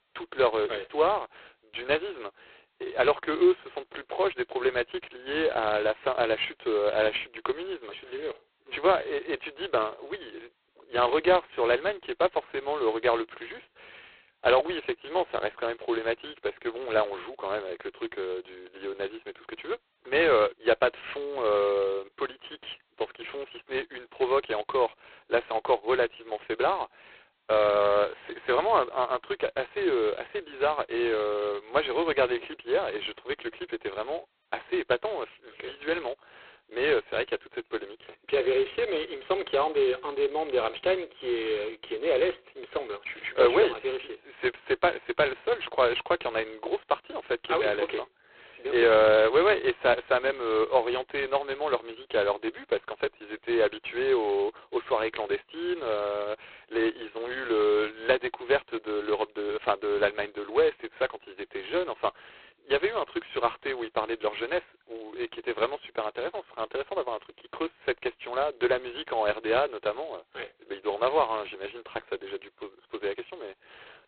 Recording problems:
phone-call audio; poor line; nothing above 4 kHz

